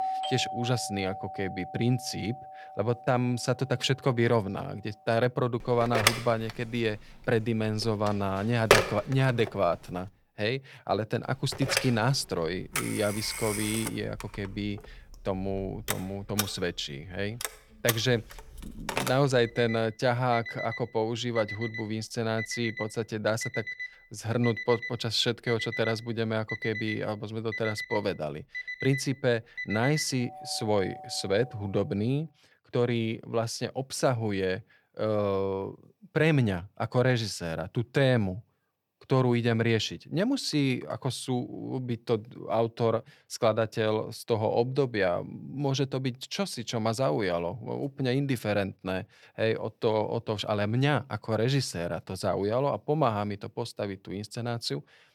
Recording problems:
alarms or sirens; loud; until 32 s; 5 dB below the speech

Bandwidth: 19 kHz